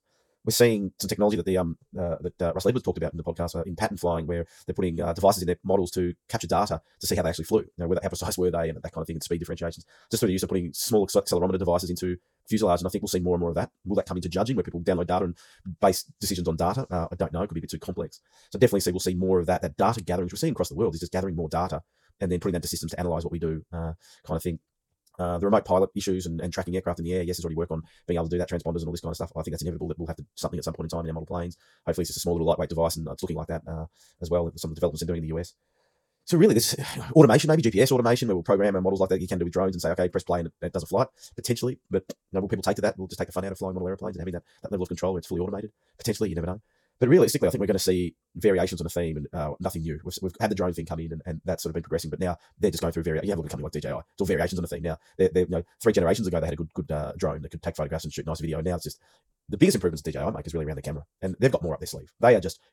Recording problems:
wrong speed, natural pitch; too fast; 1.7 times normal speed

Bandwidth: 18 kHz